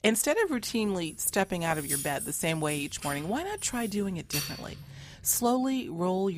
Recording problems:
jangling keys; noticeable; from 1 to 5 s; peak 1 dB below the speech
abrupt cut into speech; at the end

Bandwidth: 15 kHz